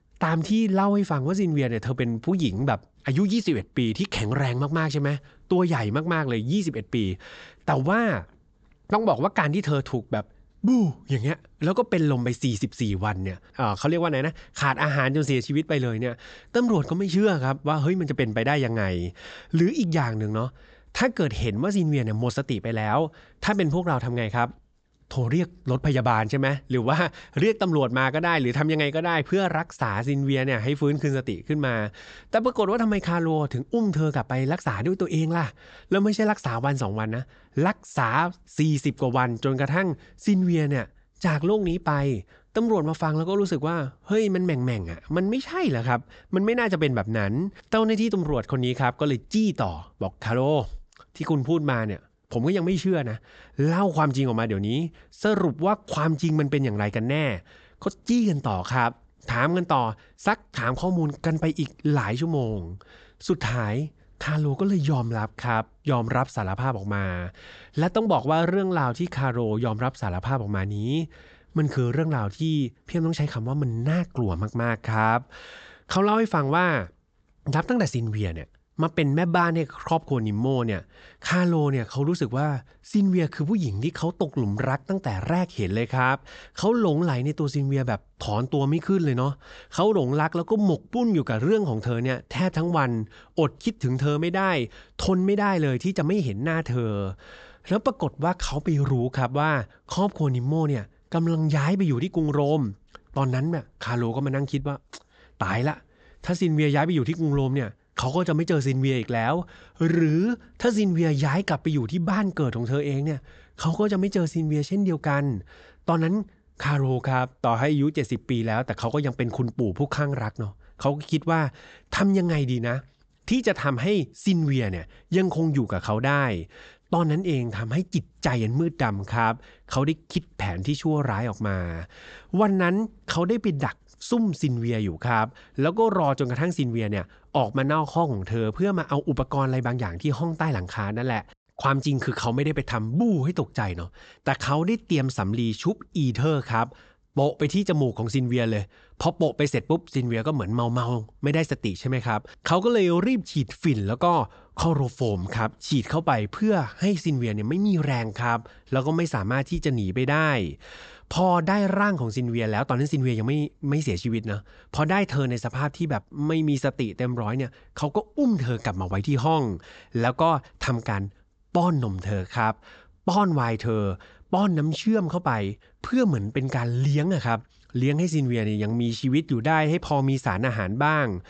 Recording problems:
high frequencies cut off; noticeable; nothing above 8 kHz

